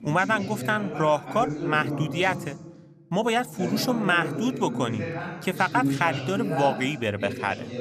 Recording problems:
background chatter; loud; throughout; 2 voices, 6 dB below the speech

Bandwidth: 14.5 kHz